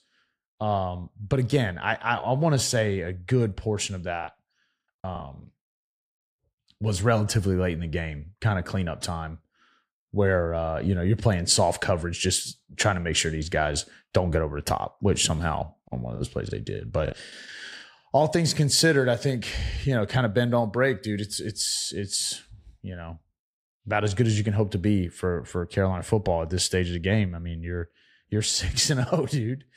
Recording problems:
choppy; very; from 16 to 18 s; 17% of the speech affected

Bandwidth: 15.5 kHz